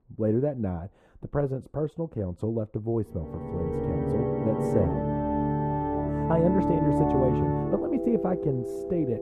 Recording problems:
muffled; very; fading above 1.5 kHz
background music; very loud; from 3.5 s on; 1 dB above the speech

